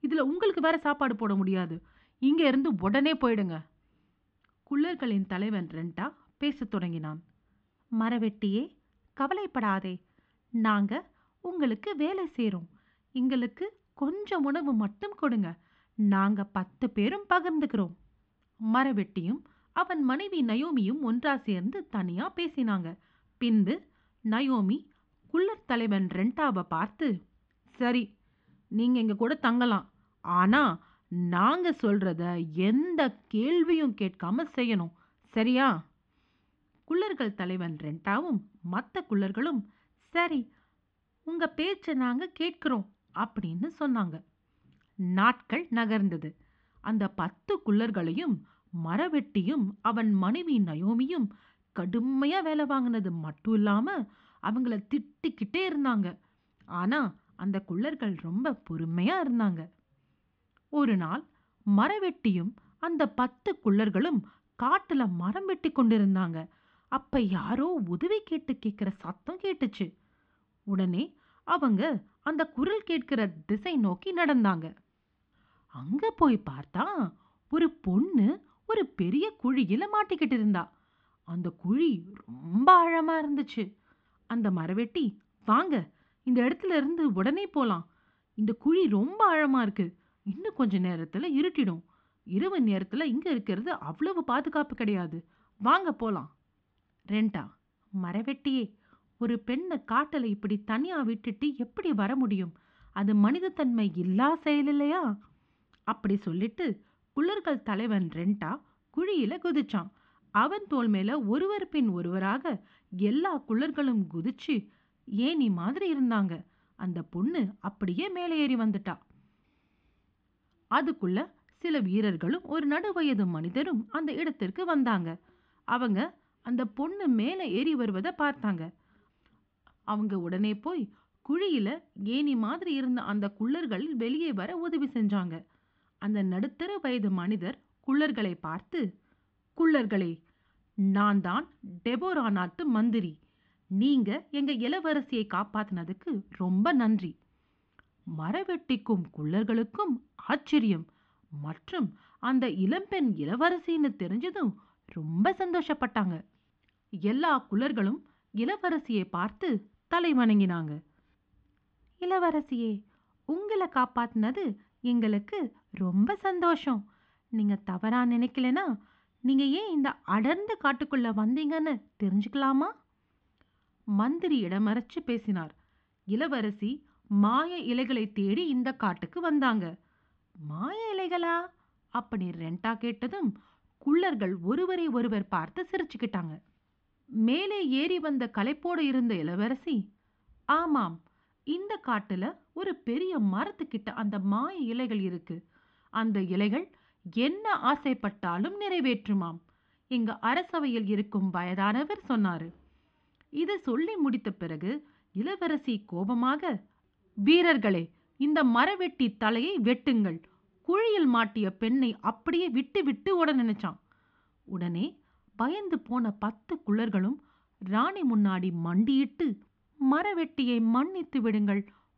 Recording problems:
muffled; very; fading above 3.5 kHz

